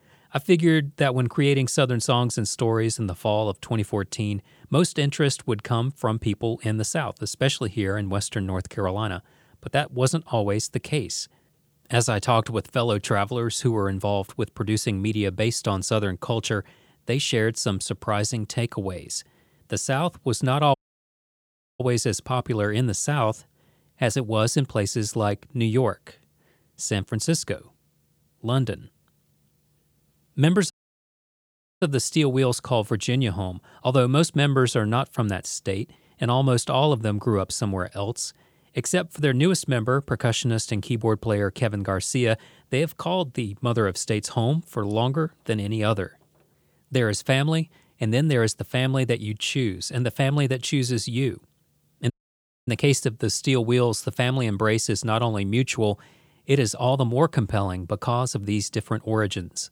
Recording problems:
audio cutting out; at 21 s for 1 s, at 31 s for 1 s and at 52 s for 0.5 s

